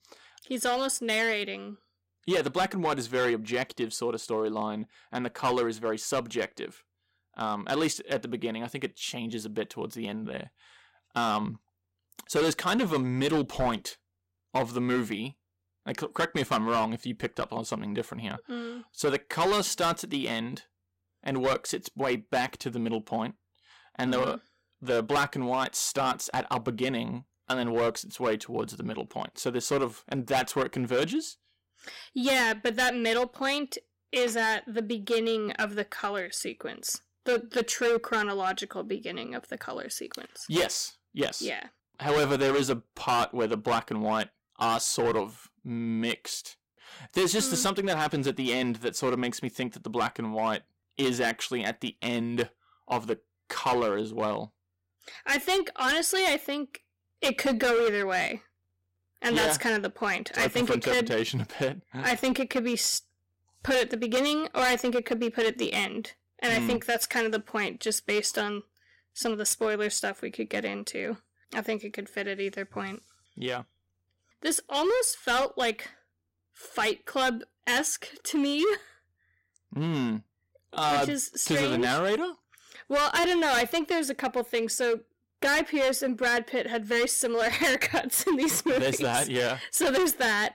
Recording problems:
distortion; heavy; 9% of the sound clipped

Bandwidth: 16 kHz